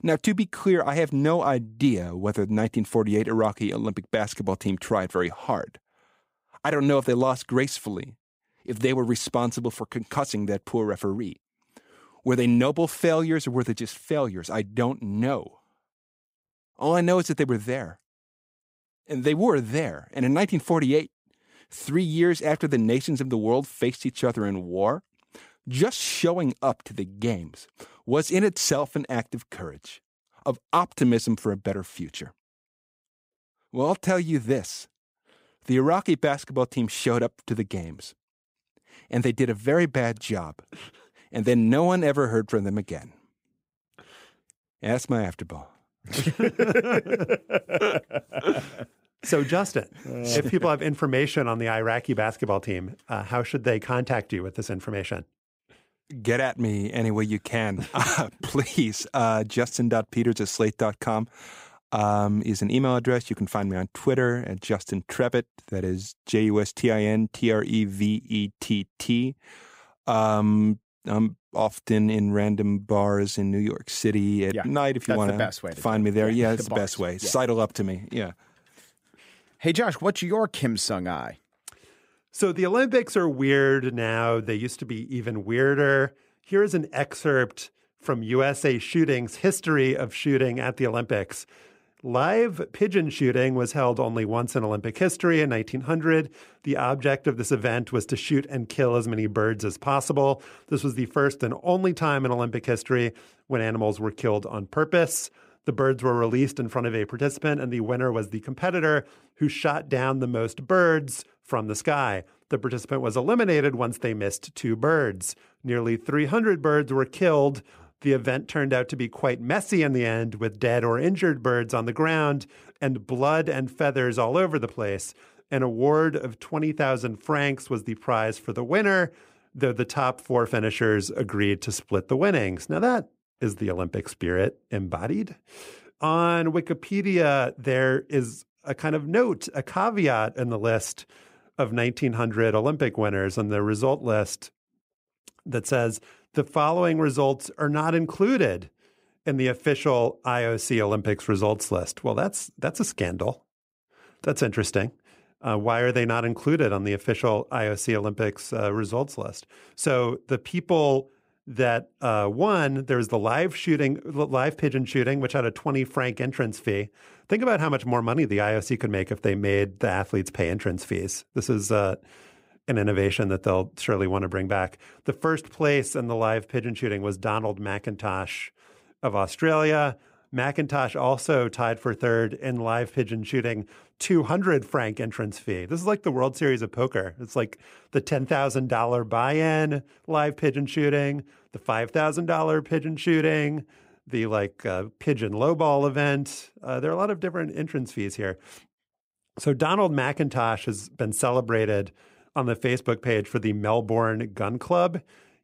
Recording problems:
none

